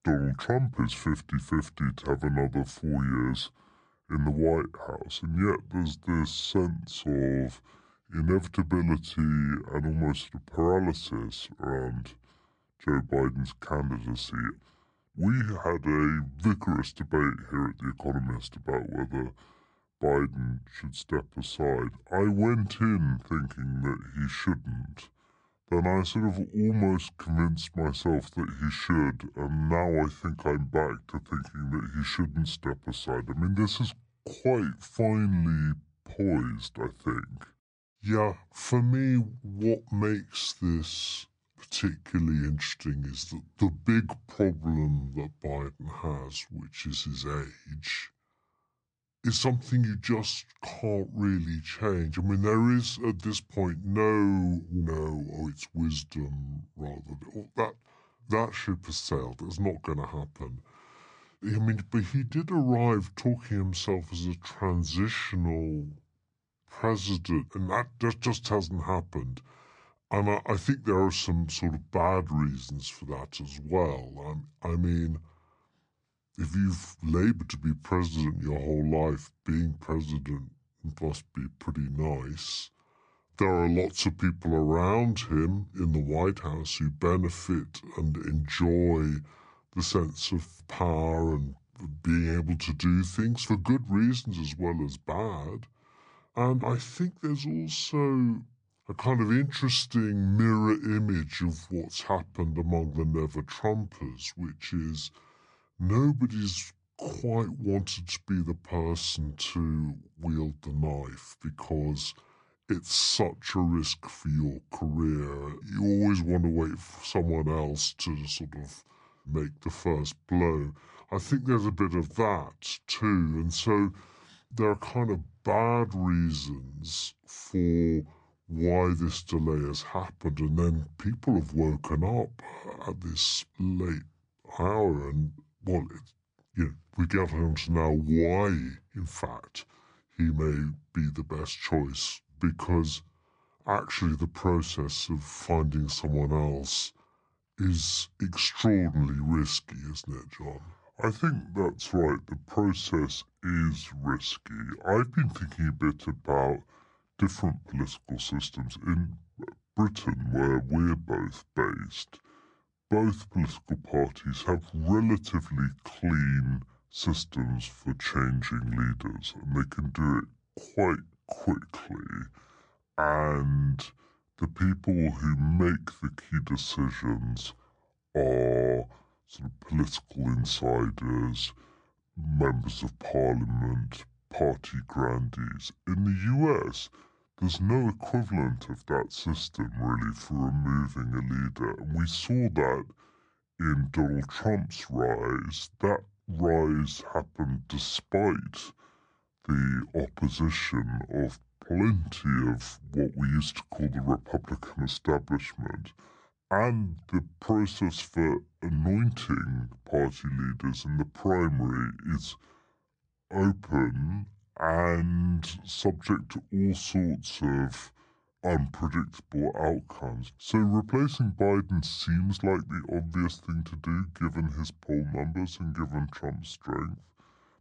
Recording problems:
wrong speed and pitch; too slow and too low; 0.7 times normal speed

